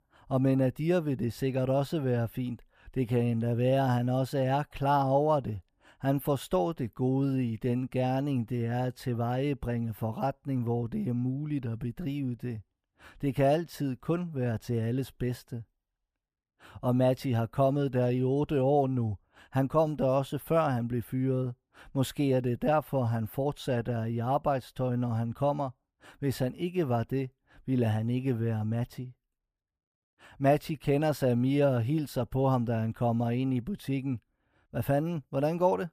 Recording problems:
muffled; slightly; fading above 2.5 kHz

